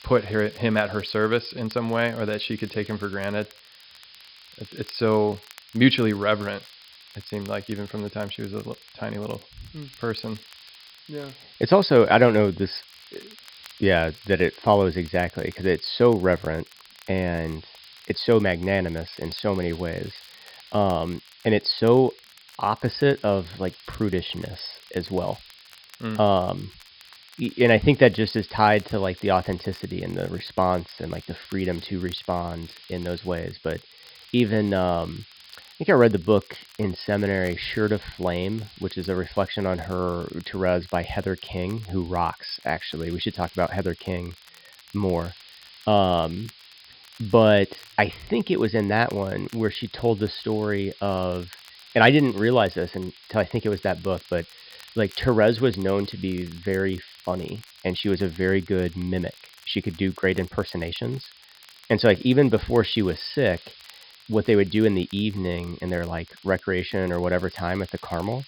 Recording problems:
high frequencies cut off; noticeable; nothing above 5.5 kHz
hiss; faint; throughout; 25 dB below the speech
crackle, like an old record; faint; 30 dB below the speech

